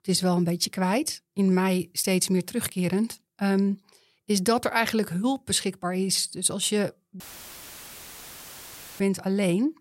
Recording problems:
audio cutting out; filled with static; at 7 s for 2 s

